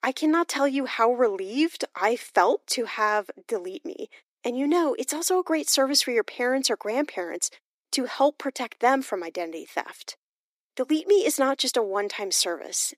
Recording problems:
thin; somewhat; fading below 300 Hz

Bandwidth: 14.5 kHz